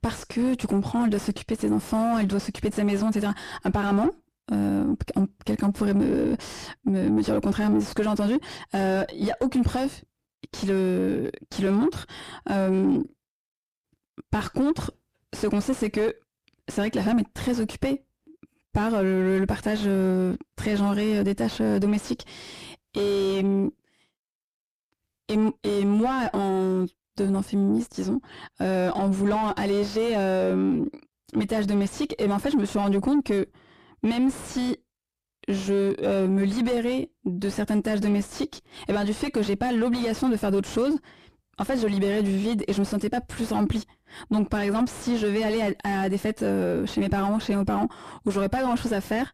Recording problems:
distortion; heavy; 7 dB below the speech

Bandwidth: 14.5 kHz